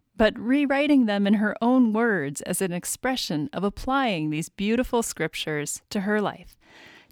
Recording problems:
none

